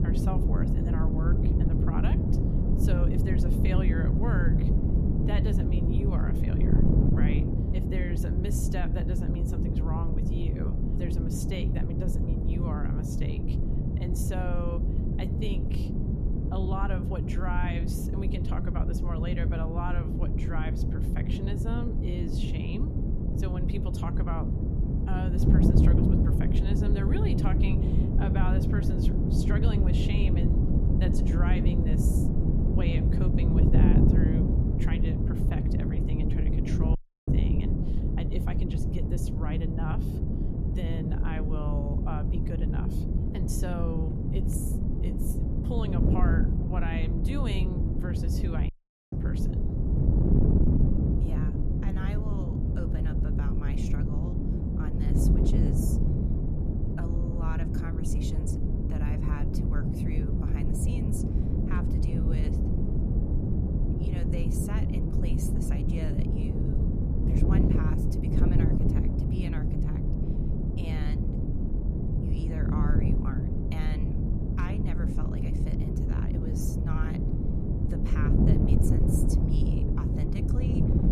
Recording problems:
wind noise on the microphone; heavy; 3 dB above the speech
audio cutting out; at 37 s and at 49 s

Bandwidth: 14.5 kHz